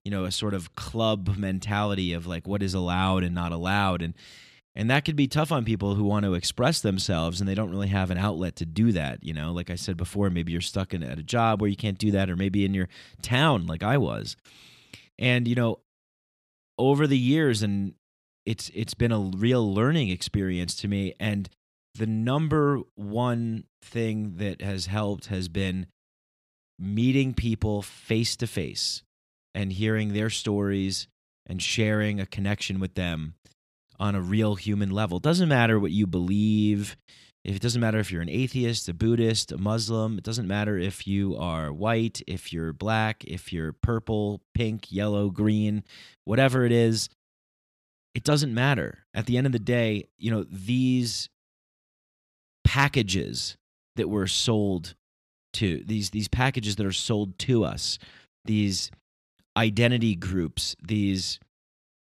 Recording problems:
none

